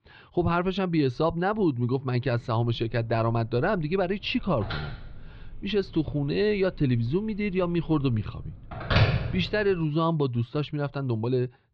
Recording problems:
muffled; very slightly; fading above 4 kHz
phone ringing; loud; from 3 to 9.5 s; peak 4 dB above the speech

